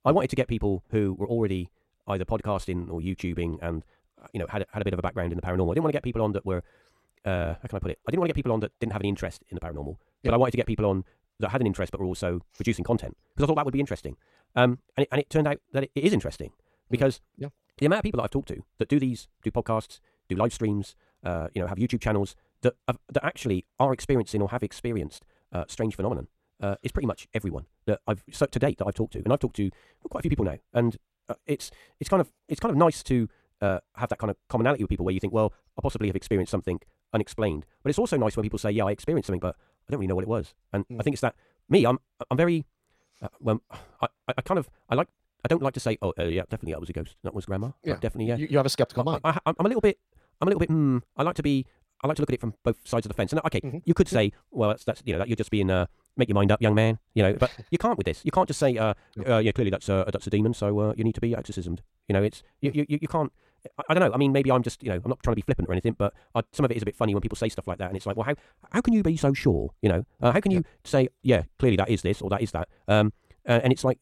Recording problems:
wrong speed, natural pitch; too fast; 1.7 times normal speed

